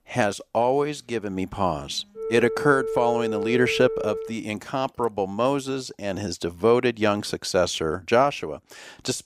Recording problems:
alarms or sirens; loud; until 4.5 s; 5 dB below the speech

